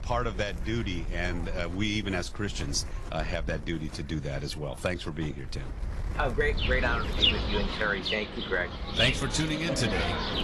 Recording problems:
garbled, watery; slightly; nothing above 11.5 kHz
animal sounds; very loud; throughout; 1 dB above the speech
wind noise on the microphone; occasional gusts; 15 dB below the speech

